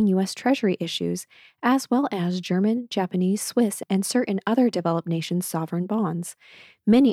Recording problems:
abrupt cut into speech; at the start and the end

